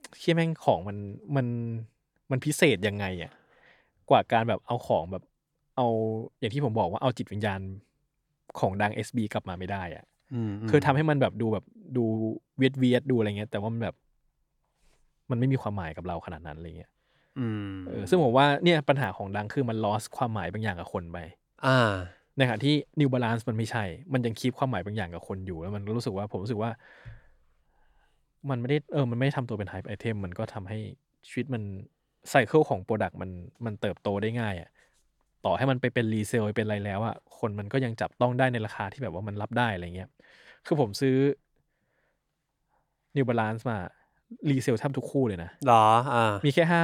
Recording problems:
abrupt cut into speech; at the end

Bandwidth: 17 kHz